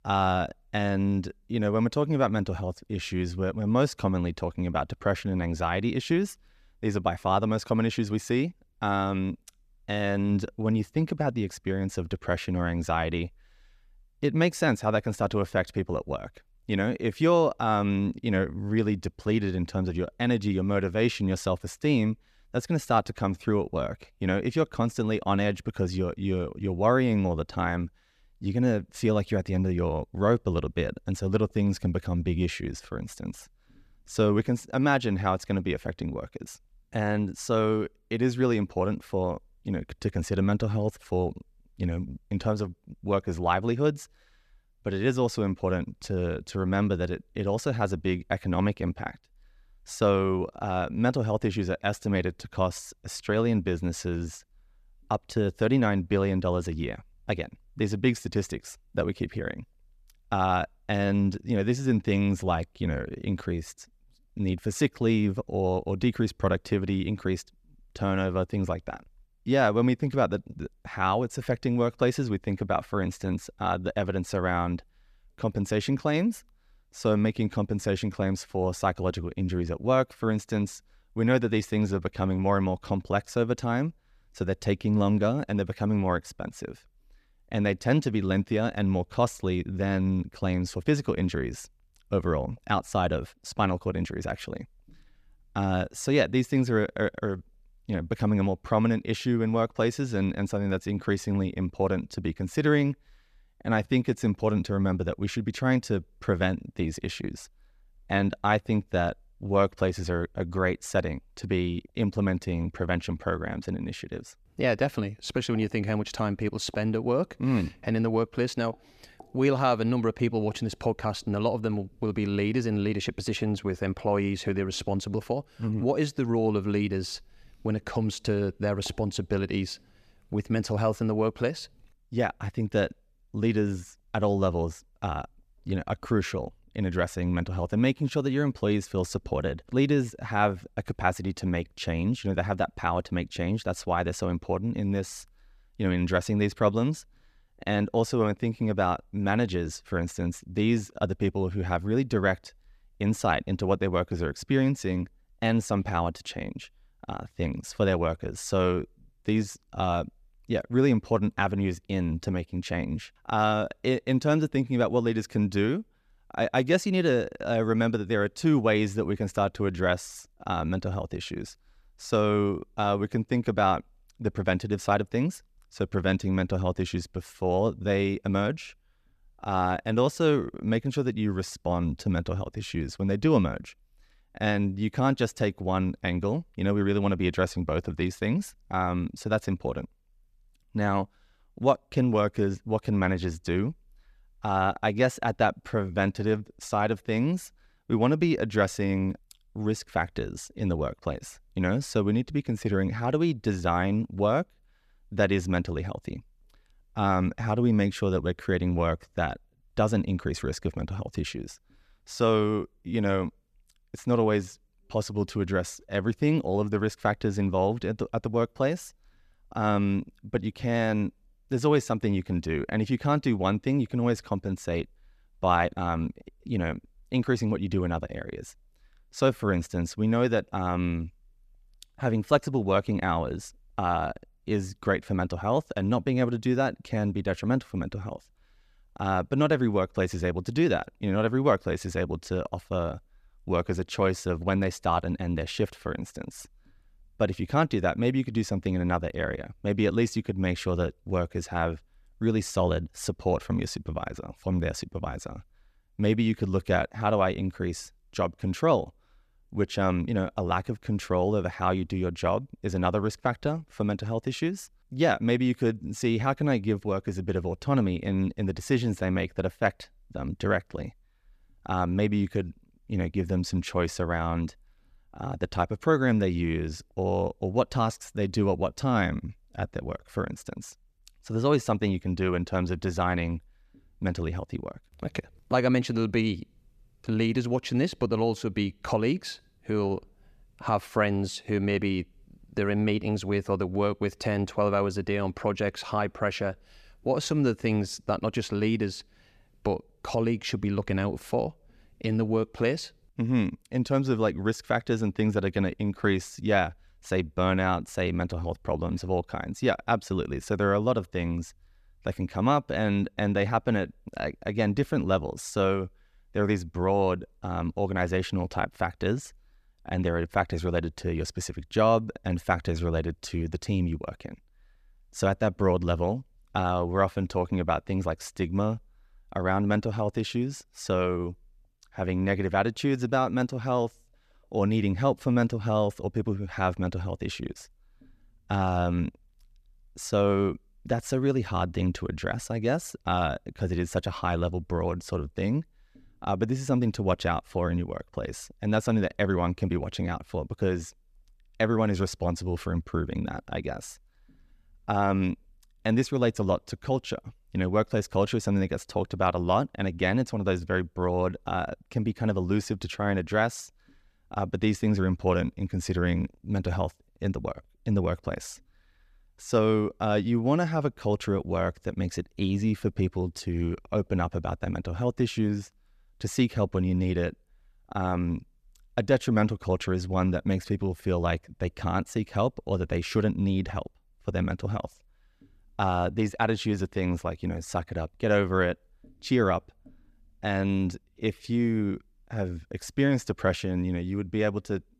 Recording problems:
none

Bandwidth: 14.5 kHz